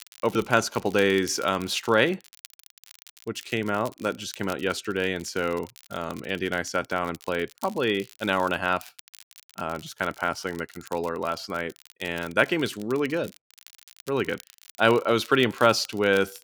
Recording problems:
crackle, like an old record; faint; 20 dB below the speech

